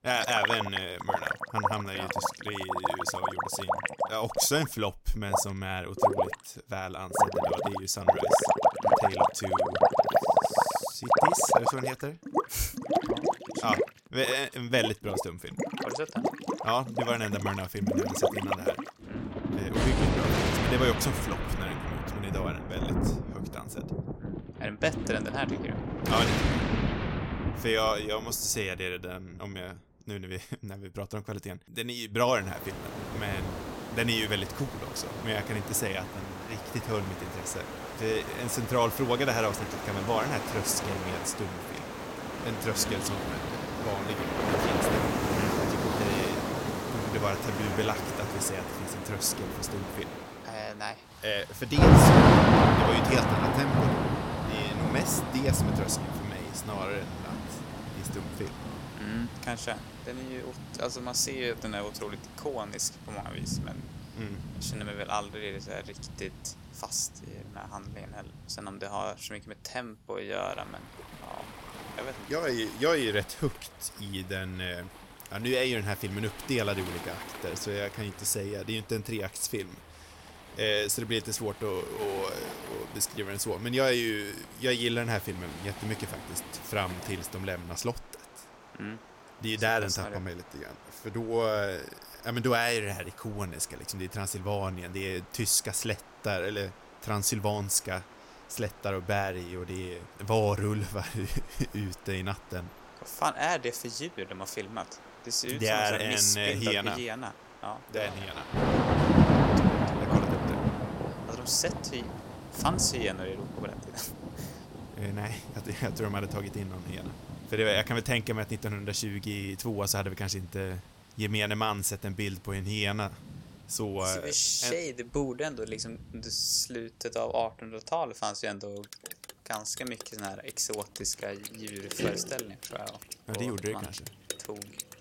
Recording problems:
rain or running water; very loud; throughout; 3 dB above the speech

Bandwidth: 16.5 kHz